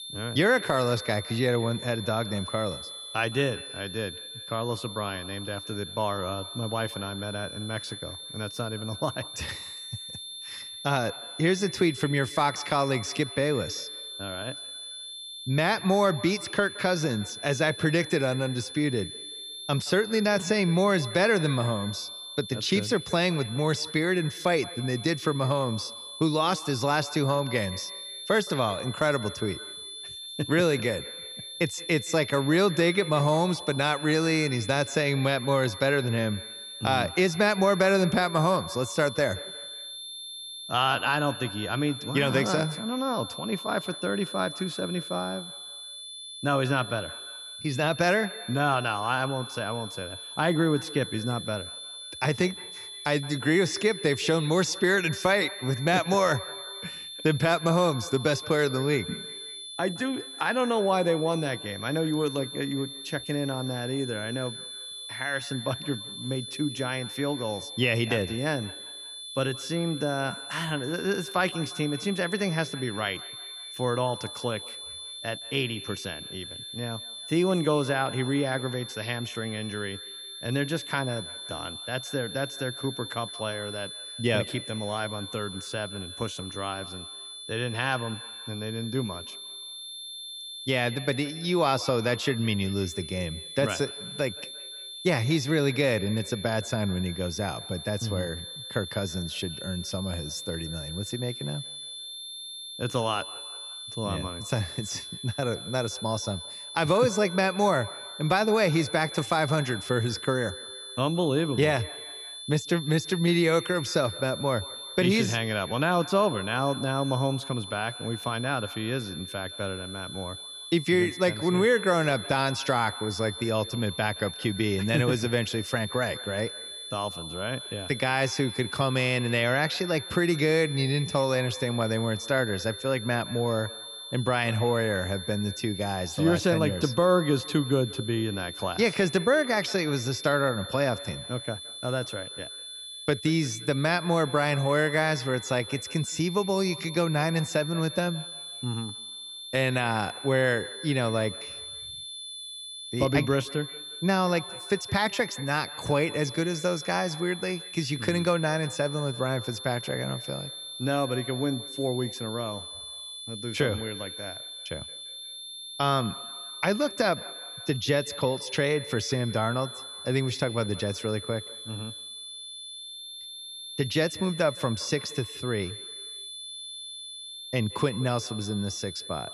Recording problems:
echo of what is said; faint; throughout; 170 ms later, 20 dB below the speech
high-pitched whine; loud; throughout; 3.5 kHz, 10 dB below the speech

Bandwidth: 14 kHz